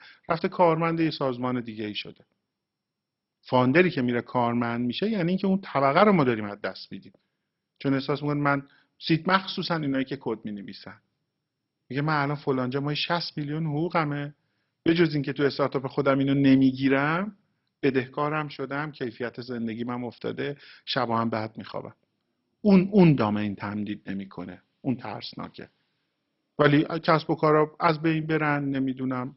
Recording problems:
garbled, watery; badly; nothing above 5.5 kHz

